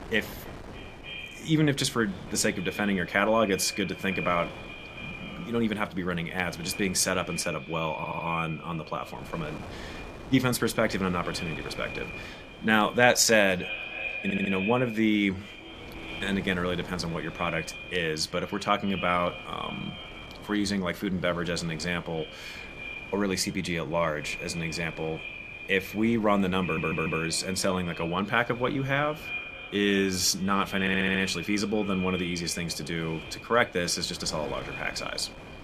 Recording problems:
echo of what is said; strong; throughout; 300 ms later, 10 dB below the speech
wind noise on the microphone; occasional gusts; 20 dB below the speech
audio stuttering; 4 times, first at 8 s

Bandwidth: 14.5 kHz